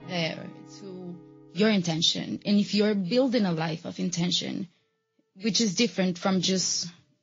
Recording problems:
high frequencies cut off; noticeable; nothing above 7 kHz
garbled, watery; slightly
background music; faint; throughout; 25 dB below the speech

